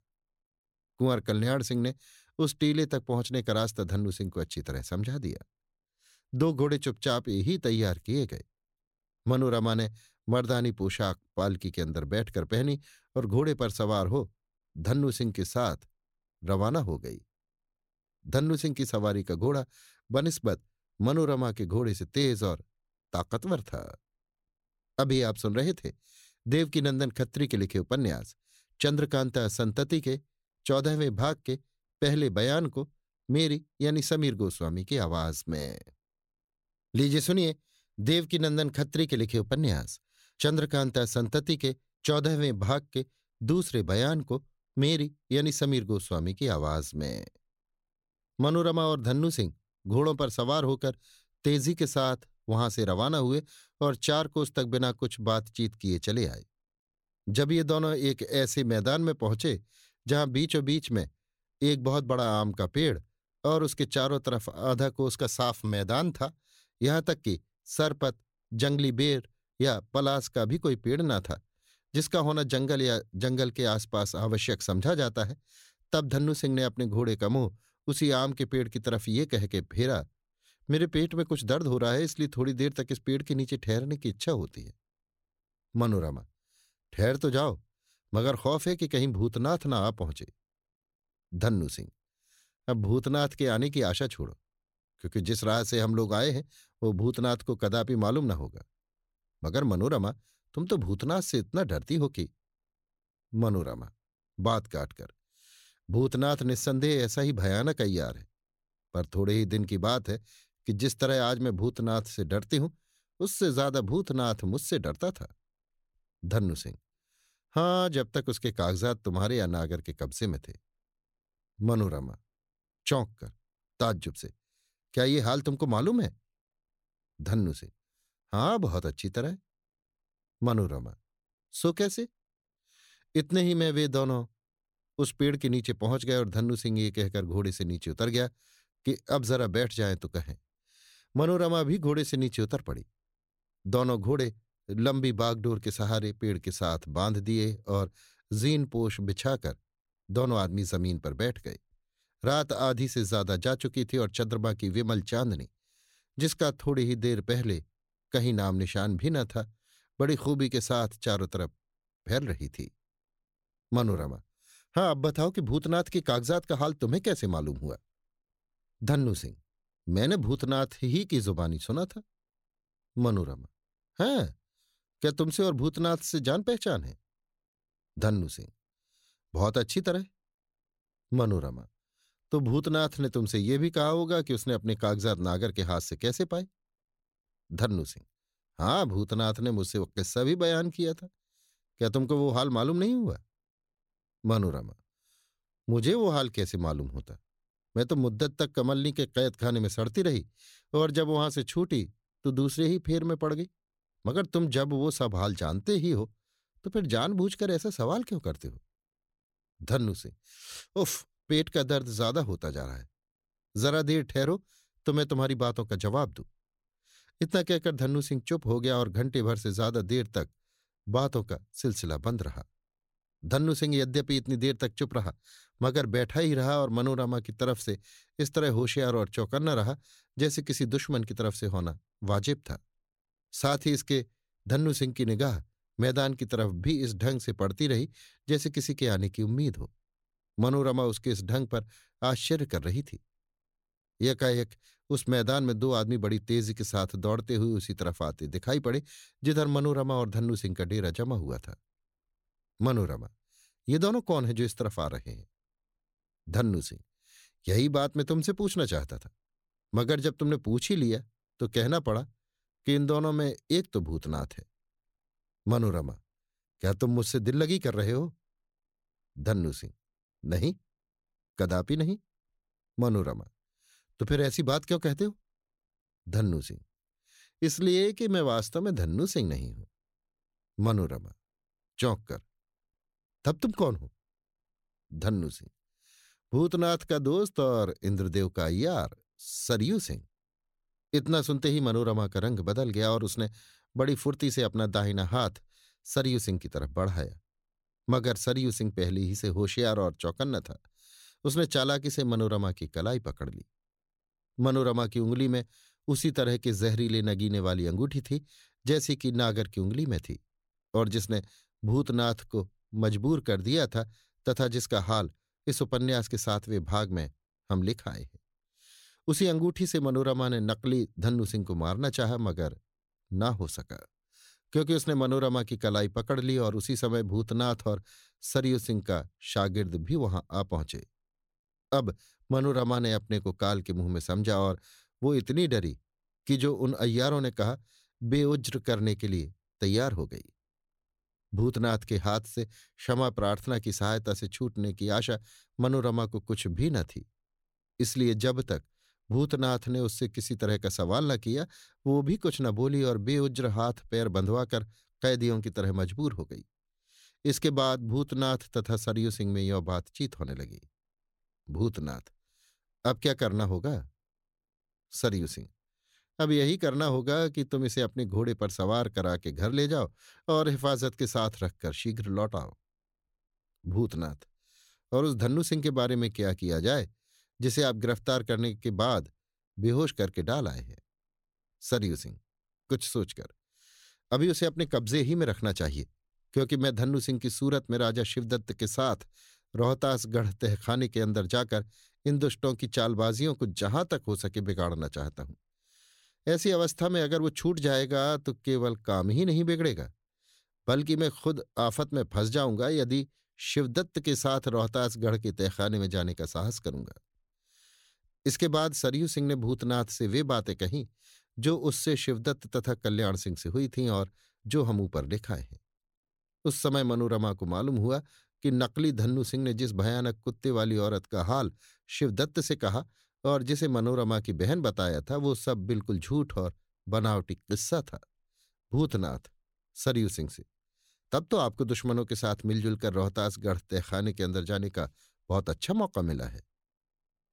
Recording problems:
none

